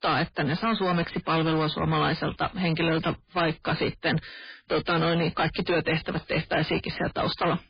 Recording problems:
distortion; heavy; 21% of the sound clipped
garbled, watery; badly; nothing above 4.5 kHz

